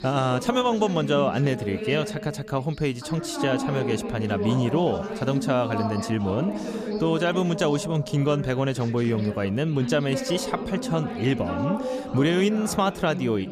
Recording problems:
background chatter; loud; throughout; 3 voices, 6 dB below the speech

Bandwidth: 14.5 kHz